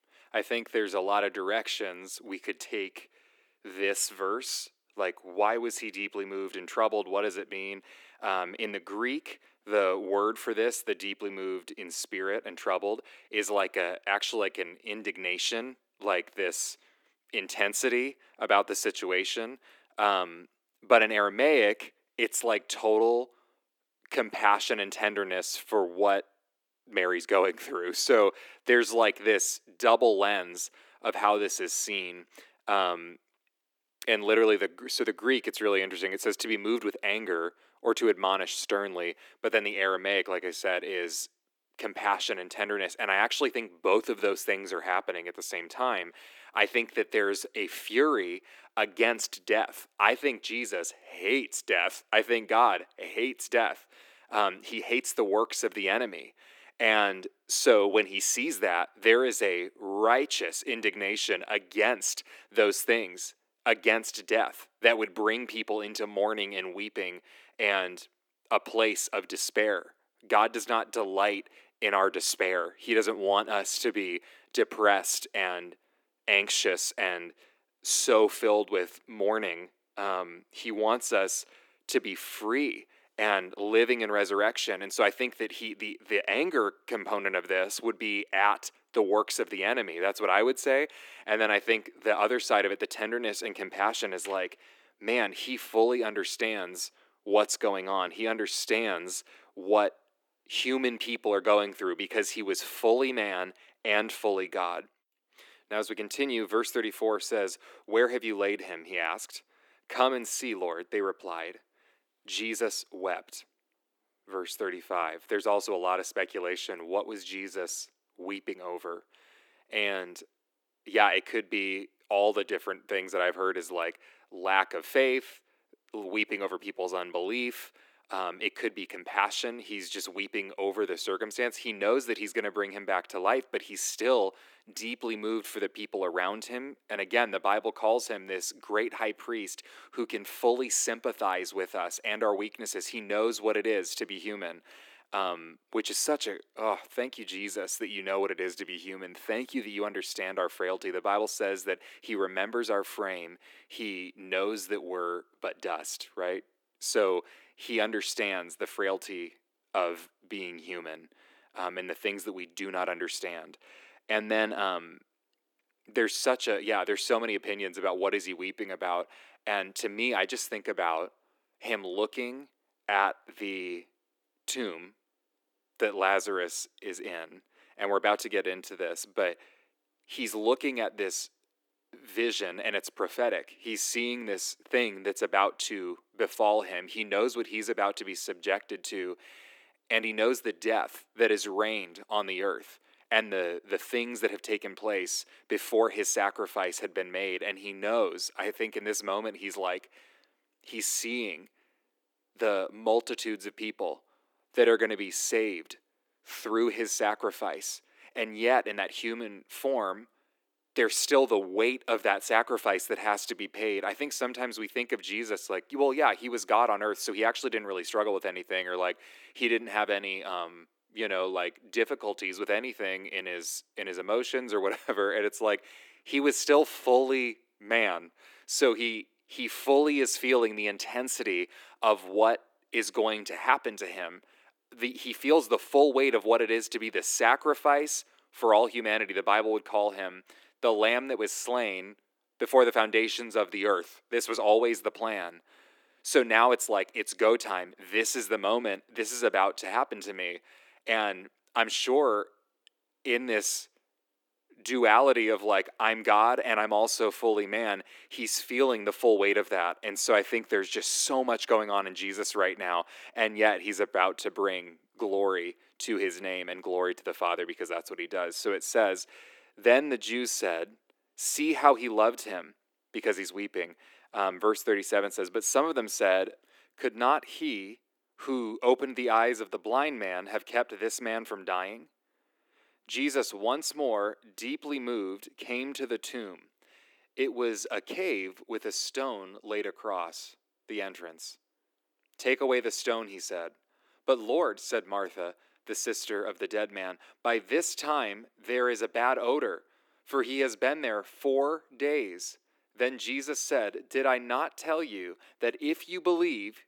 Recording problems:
thin; somewhat; fading below 300 Hz

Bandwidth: 18.5 kHz